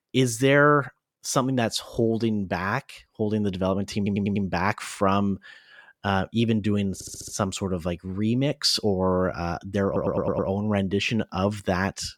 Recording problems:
audio stuttering; at 4 s, at 7 s and at 10 s

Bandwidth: 18 kHz